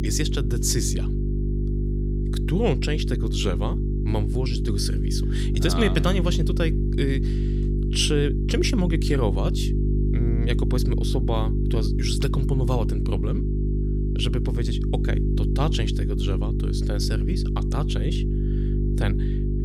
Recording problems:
electrical hum; loud; throughout; 50 Hz, 5 dB below the speech

